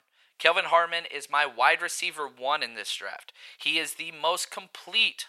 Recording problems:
thin; very; fading below 850 Hz

